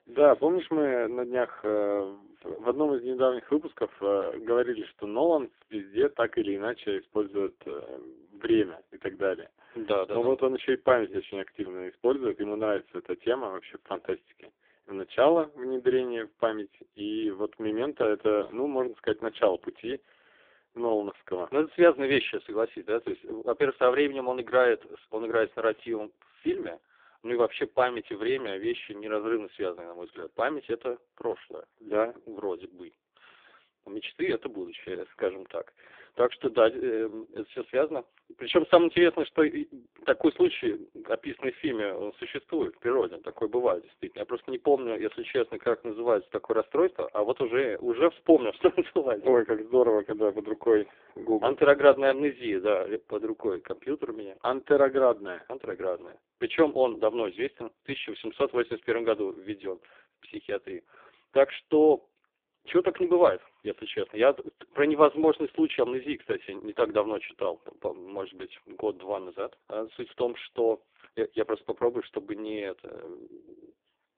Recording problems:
phone-call audio; poor line

